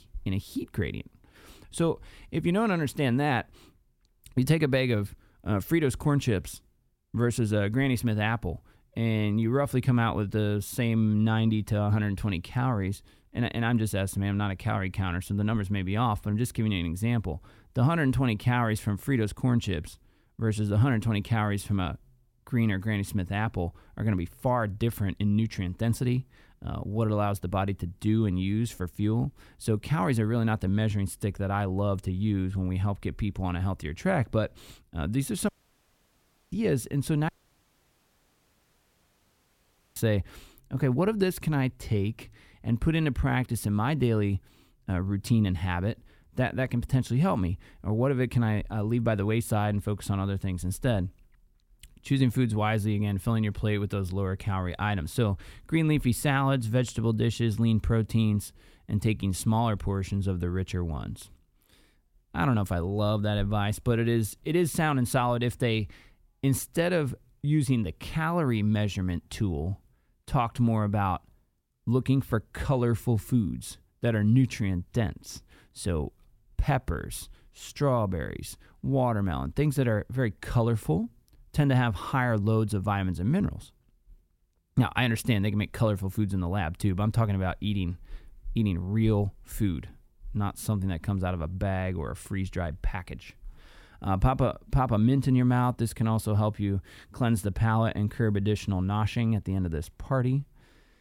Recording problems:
audio cutting out; at 35 s for 1 s and at 37 s for 2.5 s

